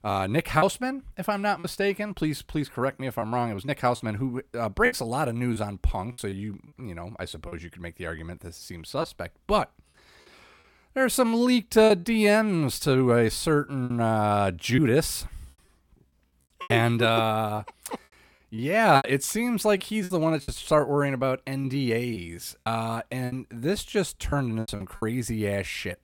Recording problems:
choppy; very; 6% of the speech affected

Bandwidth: 17 kHz